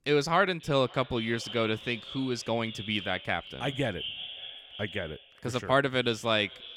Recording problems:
echo of what is said; noticeable; throughout; 530 ms later, 10 dB below the speech

